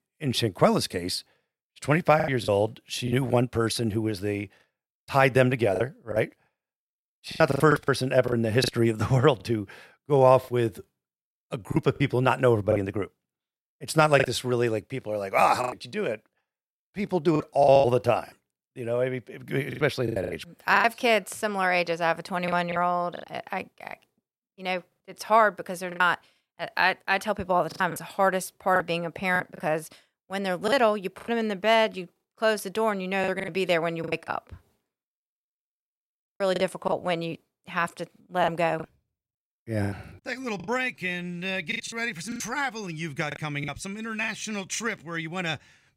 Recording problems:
choppy; very; 9% of the speech affected

